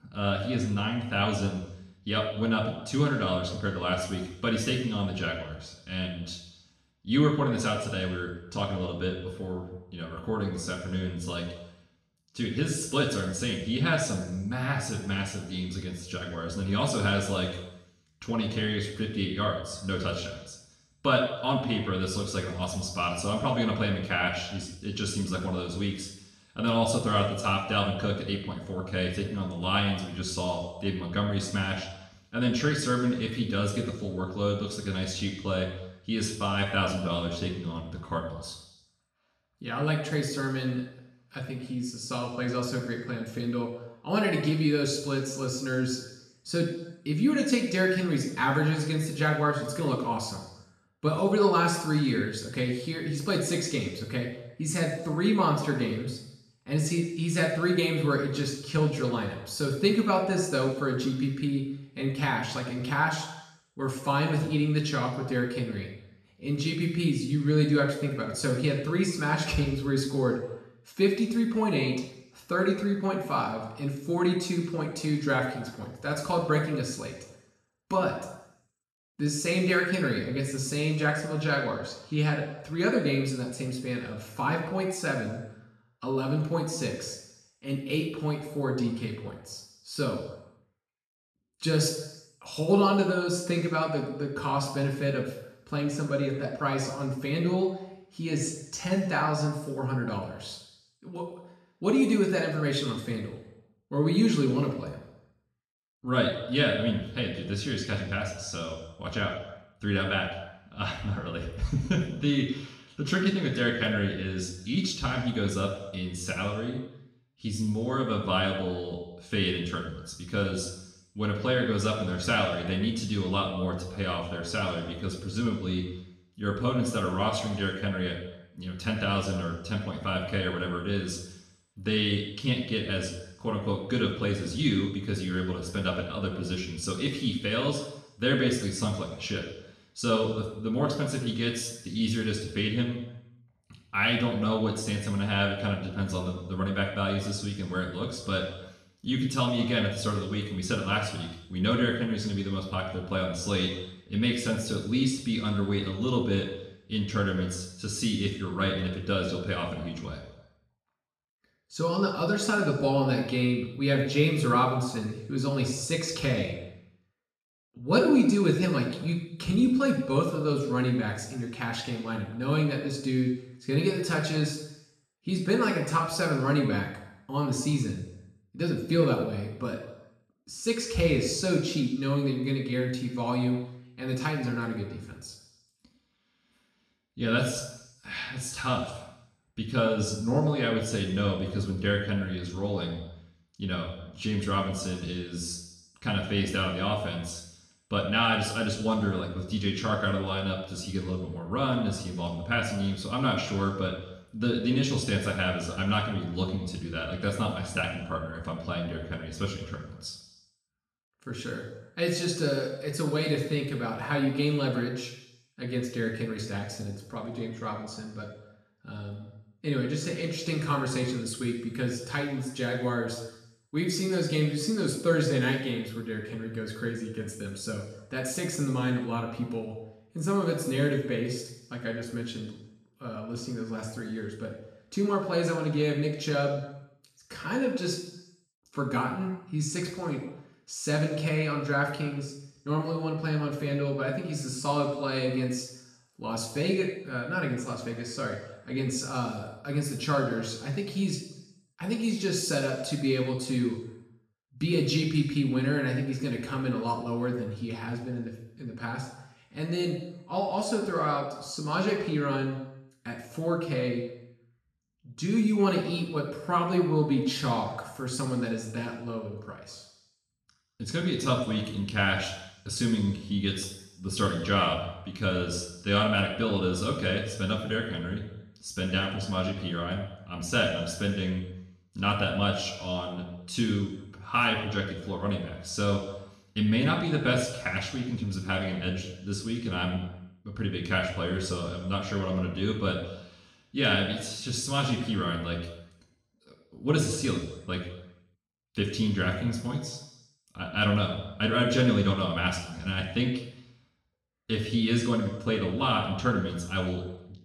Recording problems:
off-mic speech; far
room echo; noticeable; dies away in 0.8 s

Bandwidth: 13.5 kHz